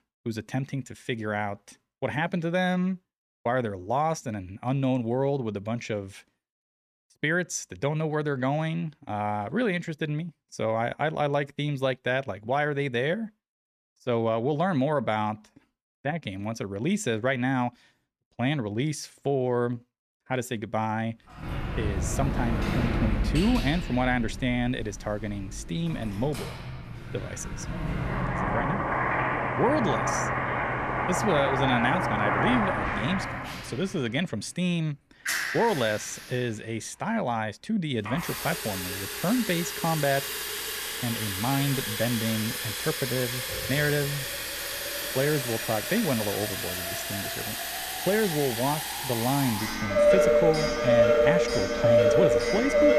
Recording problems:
household noises; very loud; from 21 s on; 1 dB above the speech

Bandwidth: 14 kHz